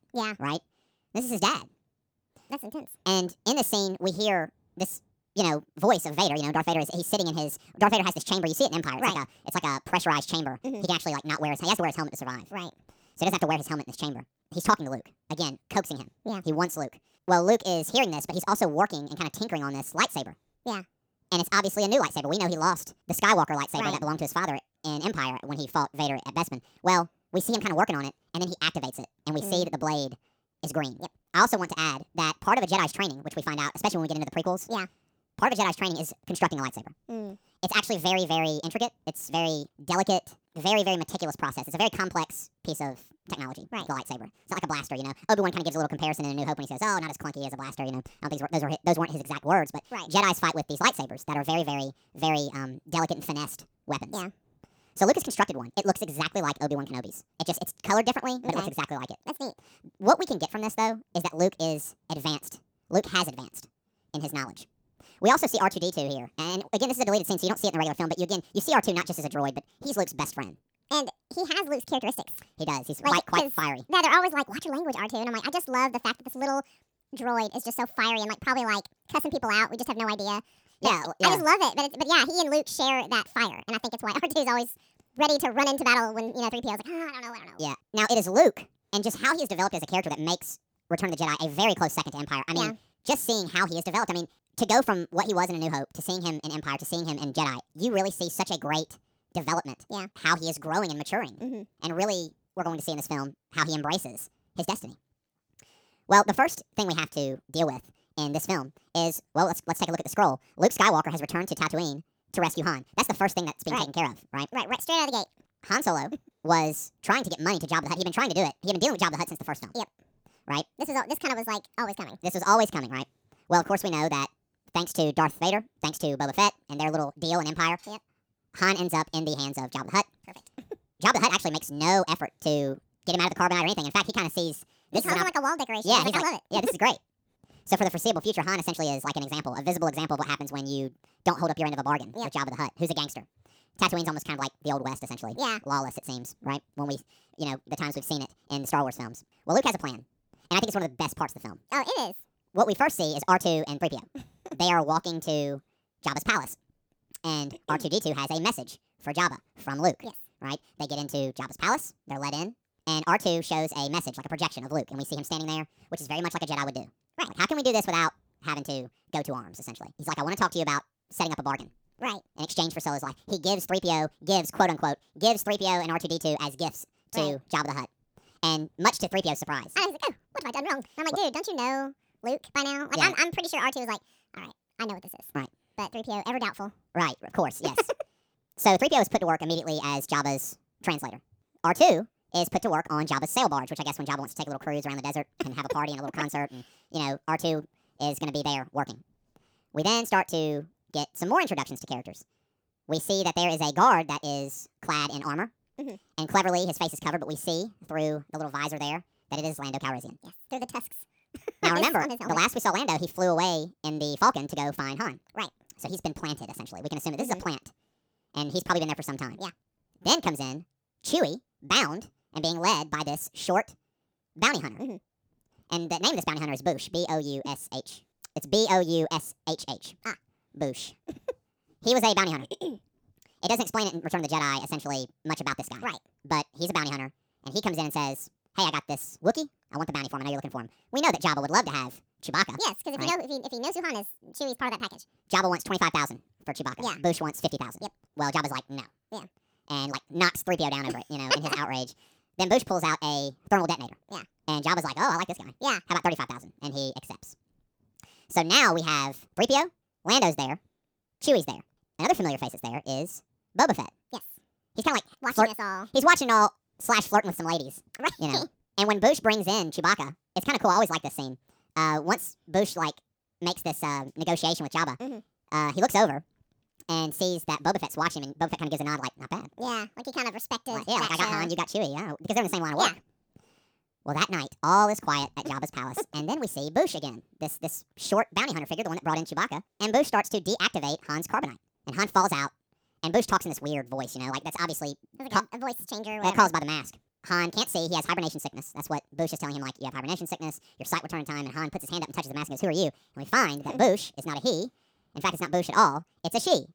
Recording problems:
wrong speed and pitch; too fast and too high; 1.6 times normal speed

